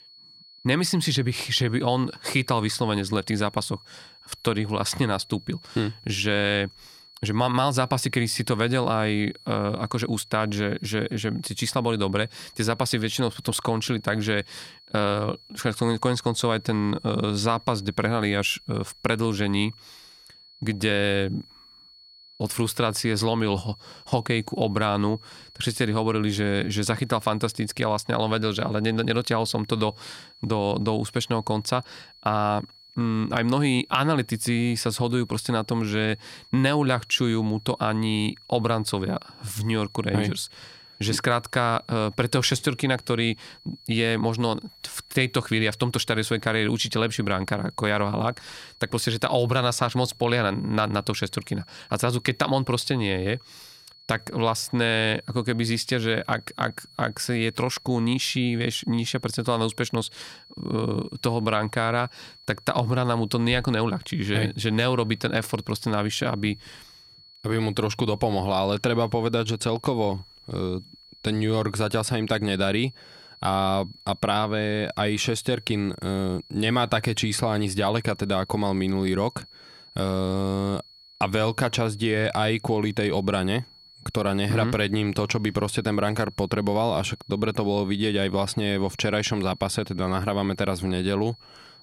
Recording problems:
high-pitched whine; faint; throughout; 4.5 kHz, 25 dB below the speech

